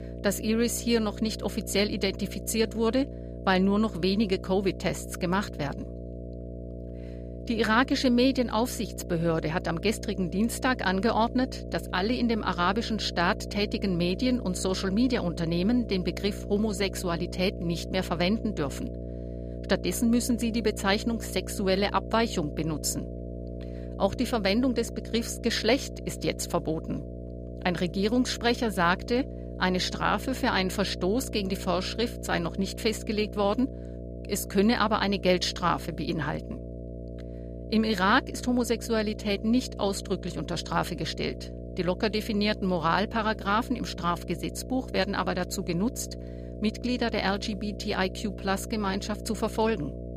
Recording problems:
electrical hum; noticeable; throughout; 60 Hz, 15 dB below the speech

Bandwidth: 15 kHz